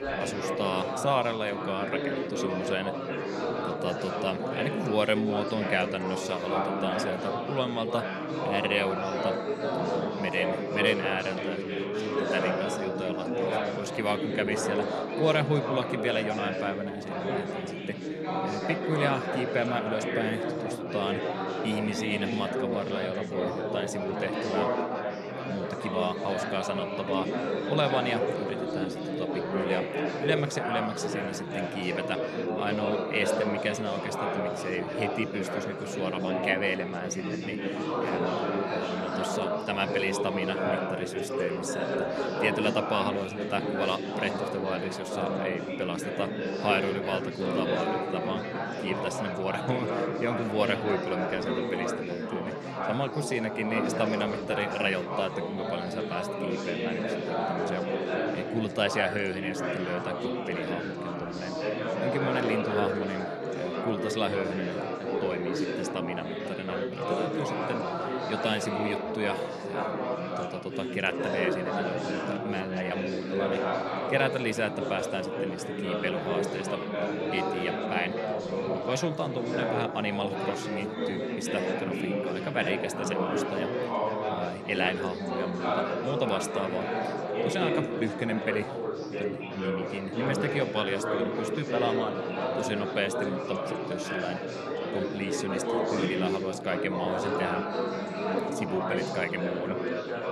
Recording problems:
chatter from many people; very loud; throughout; 1 dB above the speech

